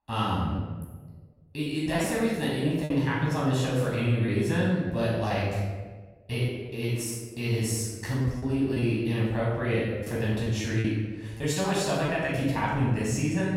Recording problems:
room echo; strong; dies away in 1.2 s
off-mic speech; far
choppy; very; 5% of the speech affected

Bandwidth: 16 kHz